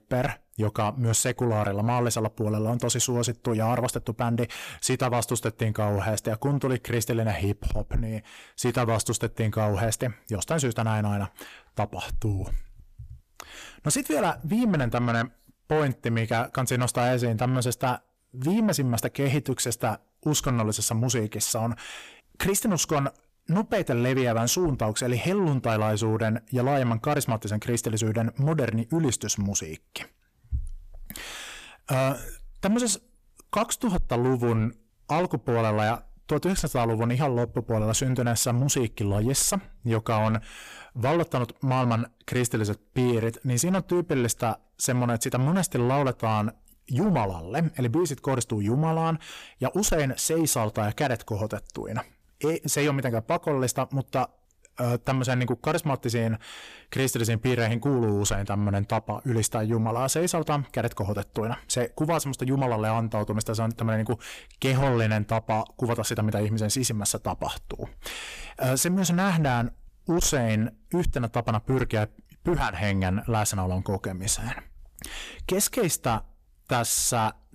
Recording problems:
distortion; slight; 10 dB below the speech

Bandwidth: 14.5 kHz